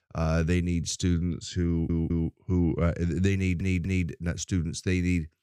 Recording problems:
audio stuttering; at 1.5 s and at 3.5 s

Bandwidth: 15.5 kHz